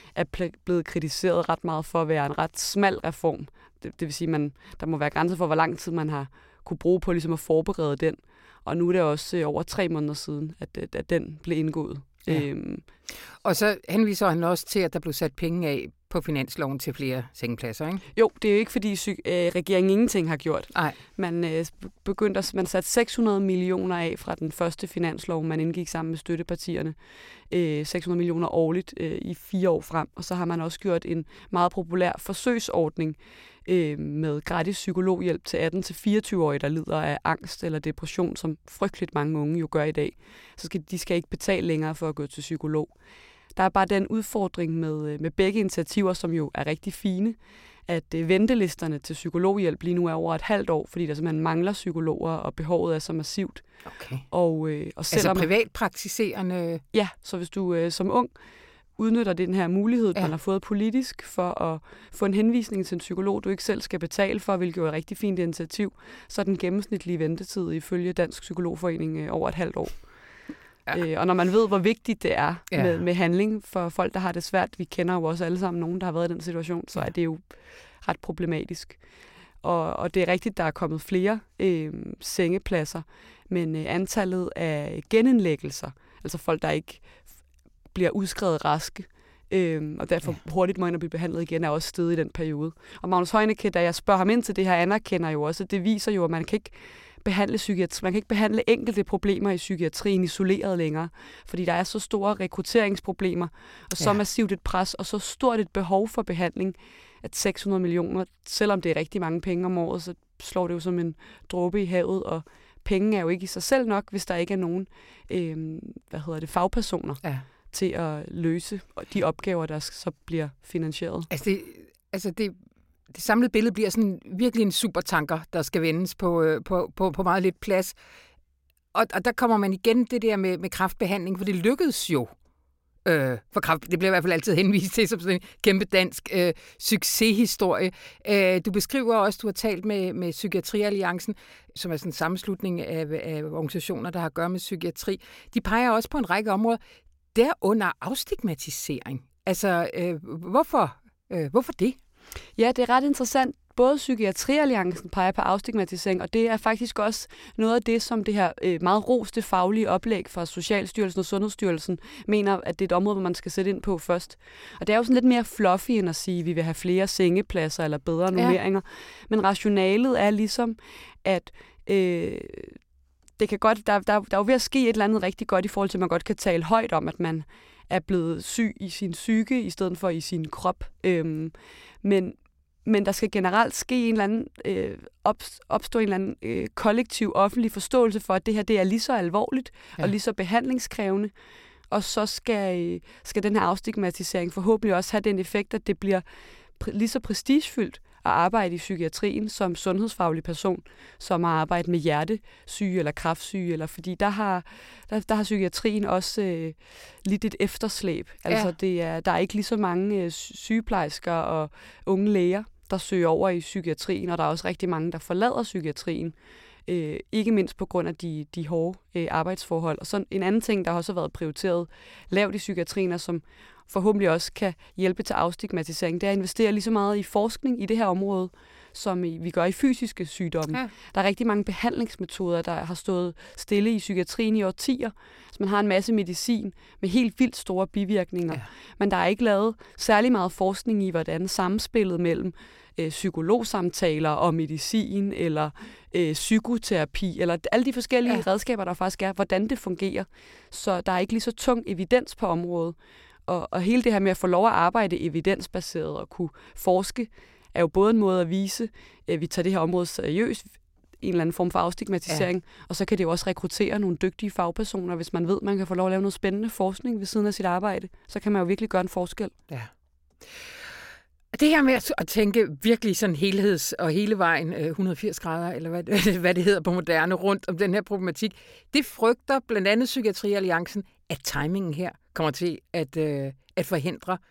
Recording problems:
none

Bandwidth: 16.5 kHz